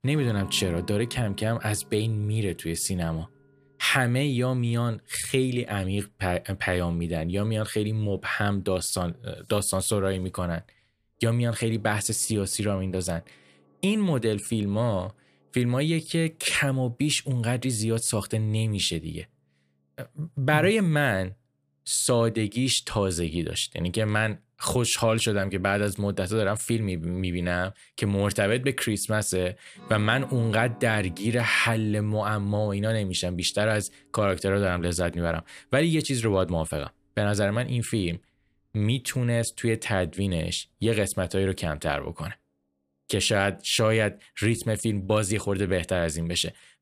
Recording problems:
background music; faint; throughout; 25 dB below the speech

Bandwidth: 15 kHz